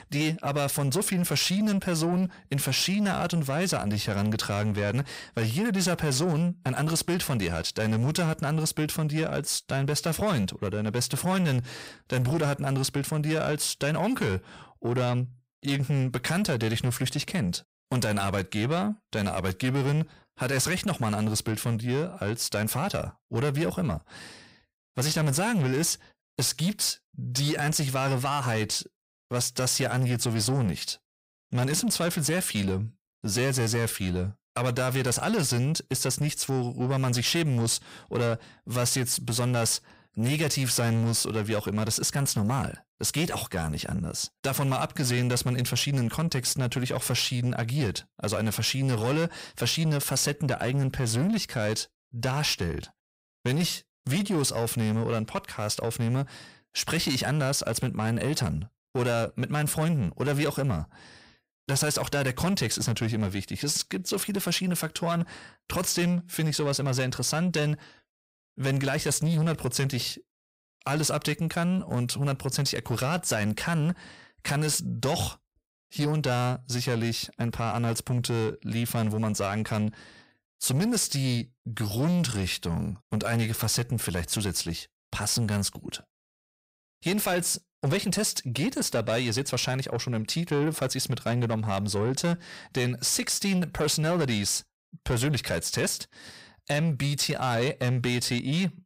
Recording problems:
distortion; slight; 10 dB below the speech

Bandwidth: 15.5 kHz